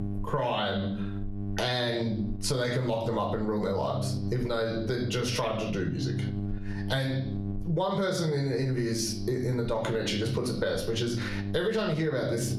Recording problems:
squashed, flat; heavily
room echo; slight; dies away in 0.4 s
off-mic speech; somewhat distant
electrical hum; noticeable; throughout; 50 Hz, 15 dB below the speech

